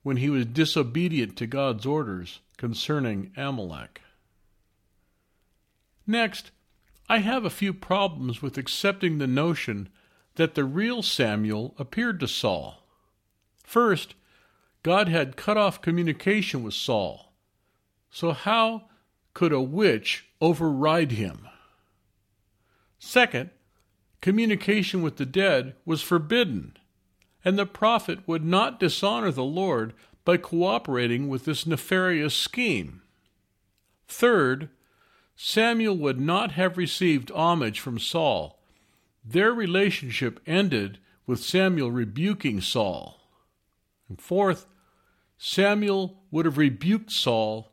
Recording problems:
none

